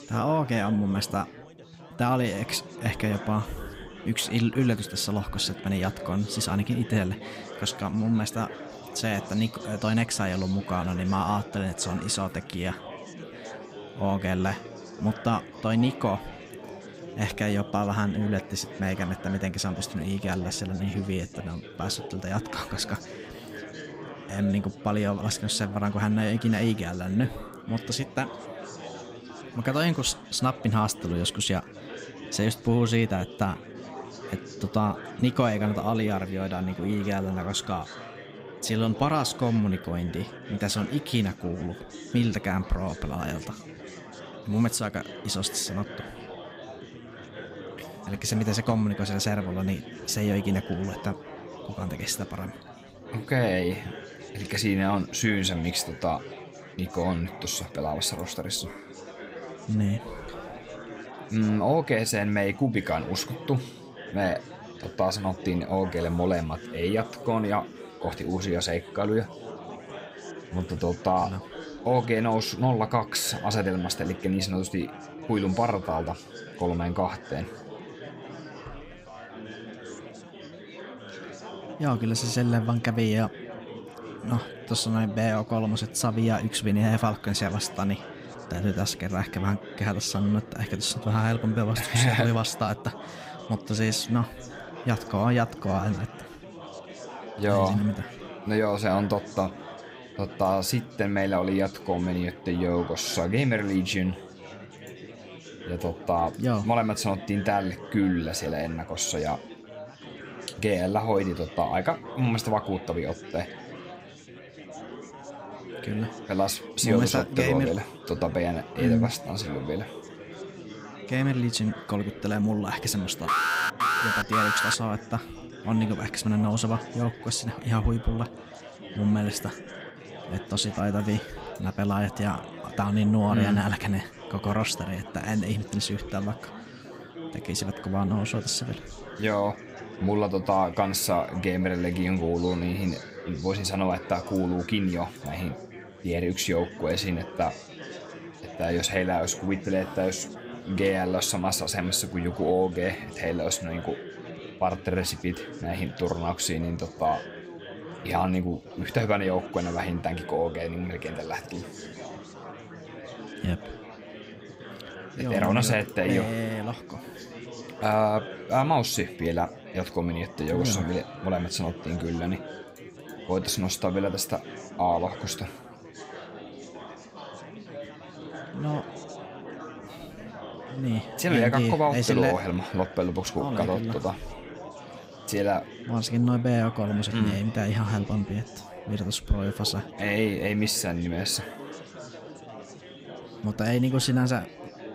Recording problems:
chatter from many people; noticeable; throughout; 15 dB below the speech
alarm; loud; from 2:03 to 2:05; peak 4 dB above the speech

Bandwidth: 15.5 kHz